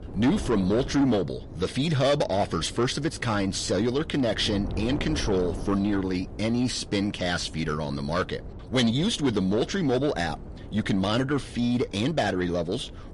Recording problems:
distortion; slight; 10 dB below the speech
garbled, watery; slightly; nothing above 11 kHz
wind noise on the microphone; occasional gusts; 15 dB below the speech

